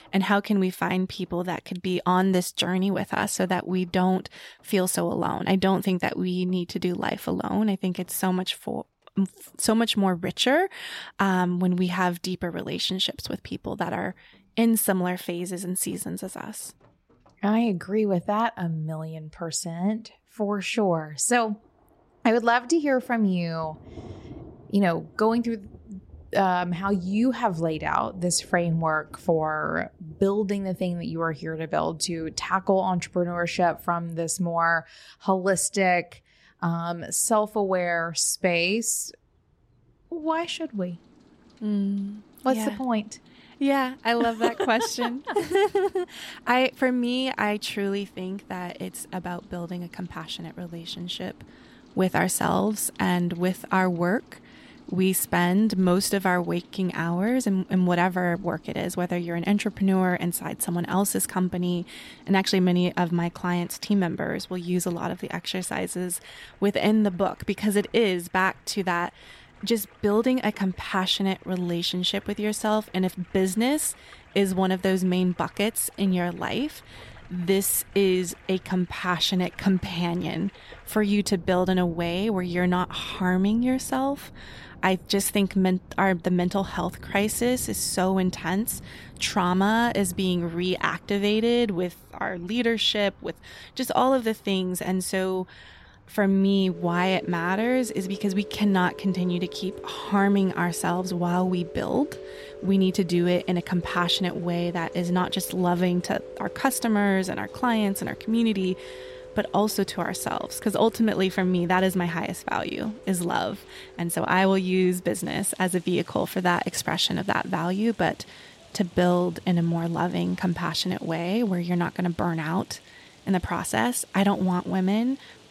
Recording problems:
rain or running water; faint; throughout; 20 dB below the speech

